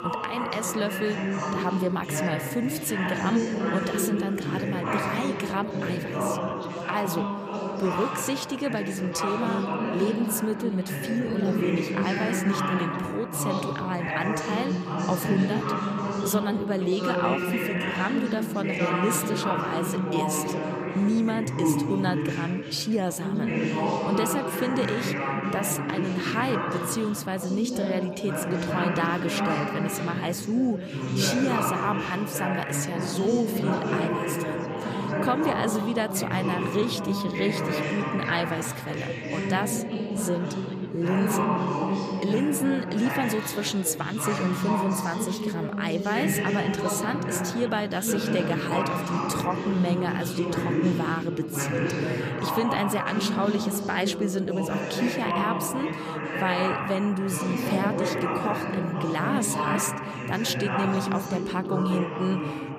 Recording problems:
chatter from many people; very loud; throughout; as loud as the speech

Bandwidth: 14.5 kHz